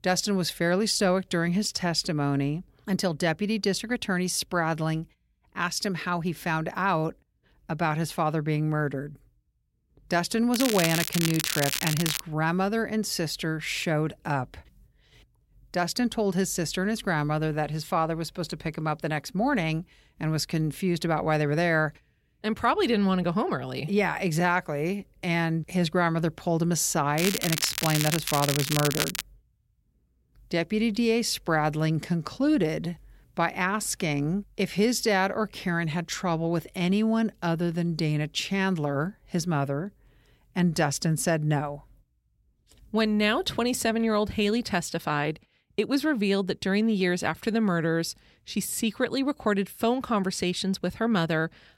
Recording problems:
crackling; loud; from 11 to 12 s and from 27 to 29 s; 2 dB below the speech

